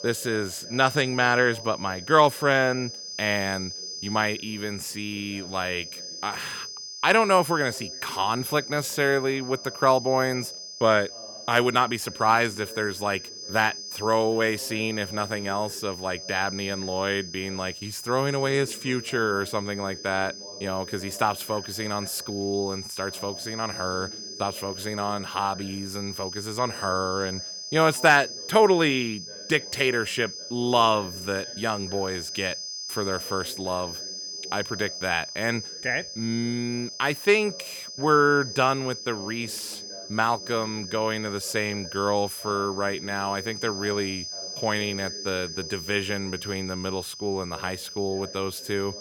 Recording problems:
high-pitched whine; loud; throughout; 5 kHz, 9 dB below the speech
voice in the background; faint; throughout; 20 dB below the speech

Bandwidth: 18.5 kHz